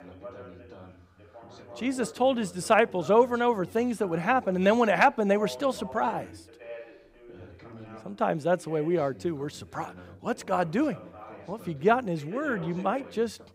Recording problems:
background chatter; noticeable; throughout; 2 voices, 20 dB below the speech

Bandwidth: 15.5 kHz